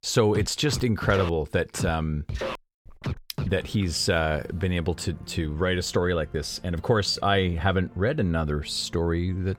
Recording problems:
background music; noticeable; throughout; 10 dB below the speech

